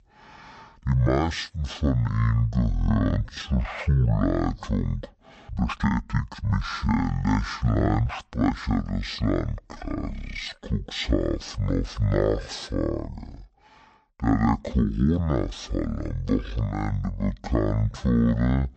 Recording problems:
wrong speed and pitch; too slow and too low; 0.5 times normal speed
uneven, jittery; strongly; from 1 to 15 s

